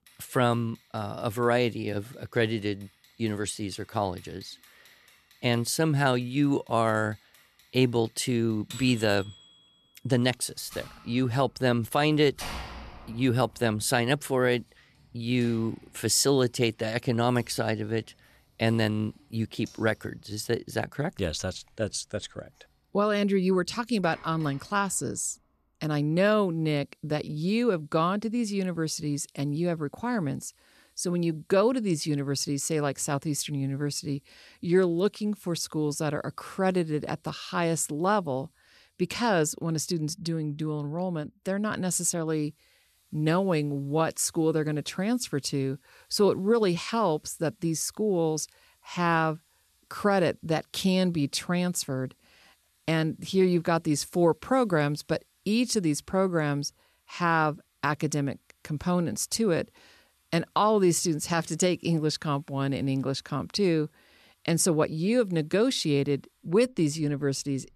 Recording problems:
household noises; faint; throughout; 25 dB below the speech

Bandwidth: 13.5 kHz